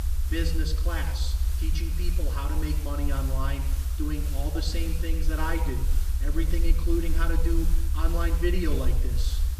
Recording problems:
off-mic speech; far
room echo; slight; dies away in 0.7 s
hiss; loud; throughout; 9 dB below the speech
low rumble; noticeable; throughout; 15 dB below the speech

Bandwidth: 14.5 kHz